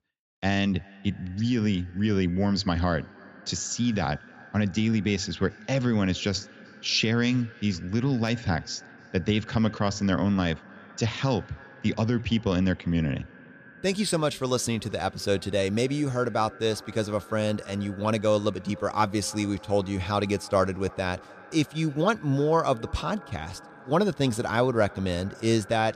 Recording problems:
echo of what is said; faint; throughout; 310 ms later, 20 dB below the speech

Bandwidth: 14.5 kHz